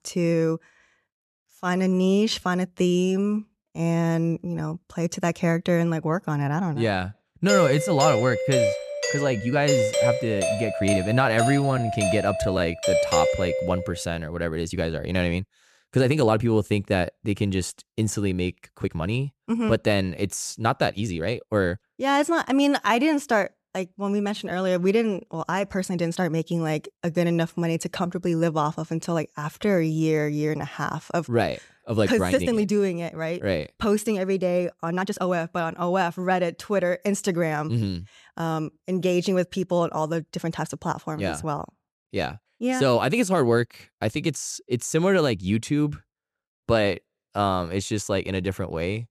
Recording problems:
uneven, jittery; strongly; from 1.5 to 35 s
doorbell; loud; from 7.5 to 14 s; peak 3 dB above the speech

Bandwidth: 14 kHz